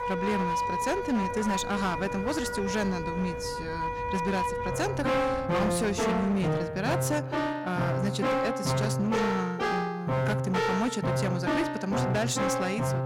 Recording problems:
echo of what is said; faint; throughout; 380 ms later, 20 dB below the speech
distortion; slight; 17% of the sound clipped
background music; very loud; throughout; 1 dB above the speech
traffic noise; noticeable; until 6.5 s; 15 dB below the speech

